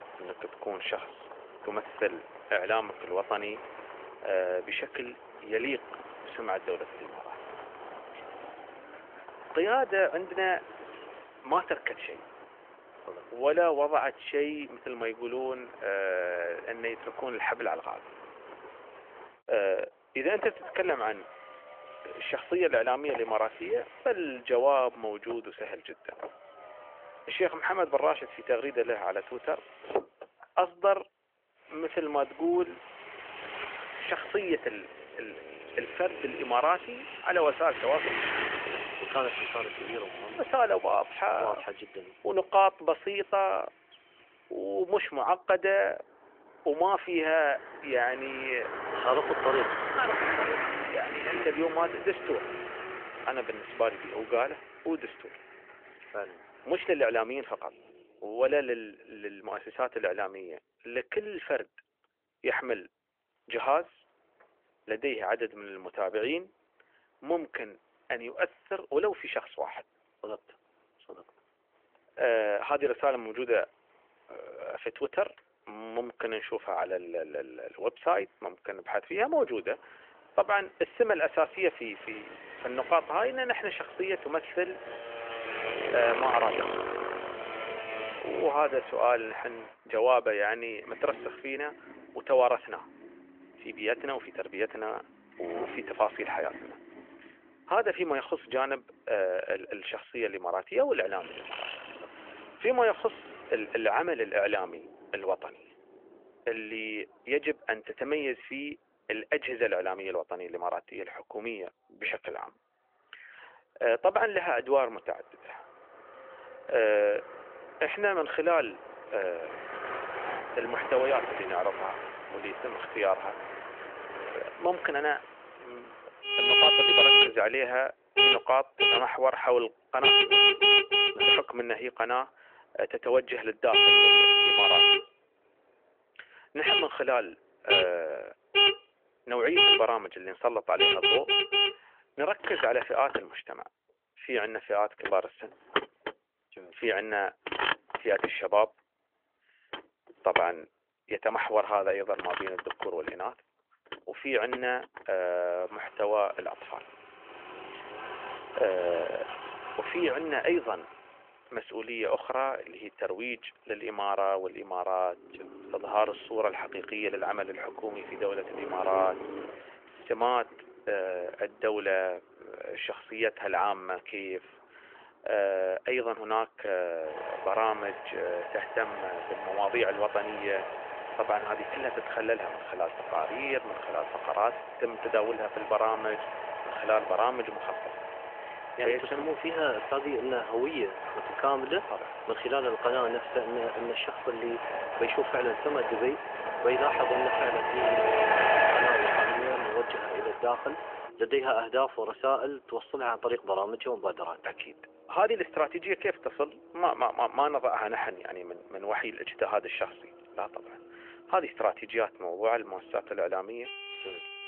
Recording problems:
phone-call audio; nothing above 3 kHz
traffic noise; very loud; throughout; 3 dB above the speech

